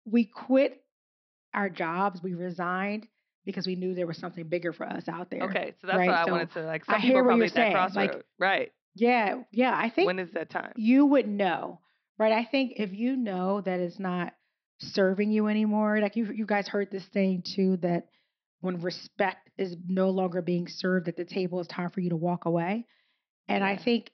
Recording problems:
high frequencies cut off; noticeable; nothing above 5.5 kHz

